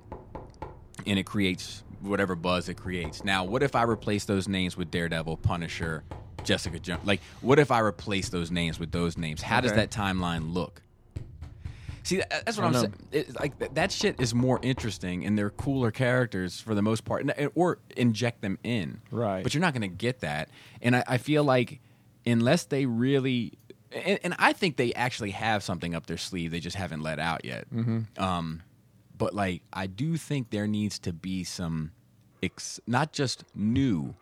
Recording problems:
household noises; noticeable; throughout; 20 dB below the speech

